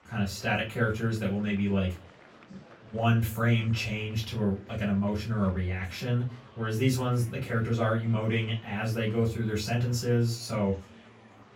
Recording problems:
off-mic speech; far
room echo; very slight; dies away in 0.2 s
murmuring crowd; faint; throughout; 25 dB below the speech

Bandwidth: 16.5 kHz